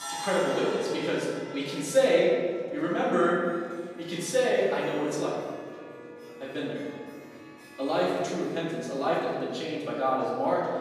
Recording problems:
off-mic speech; far
room echo; noticeable; dies away in 1.7 s
background music; noticeable; throughout; 15 dB below the speech
murmuring crowd; faint; throughout; 25 dB below the speech

